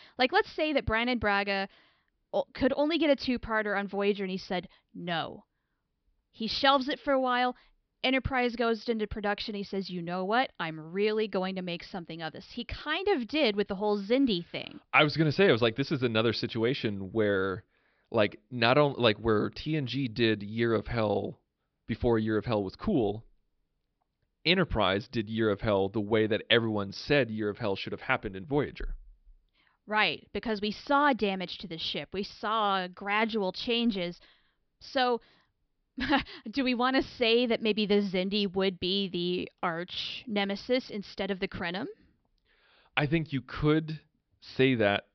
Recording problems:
high frequencies cut off; noticeable; nothing above 5.5 kHz

